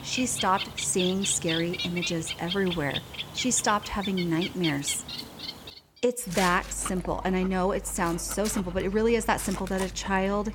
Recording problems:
animal sounds; loud; throughout; 7 dB below the speech

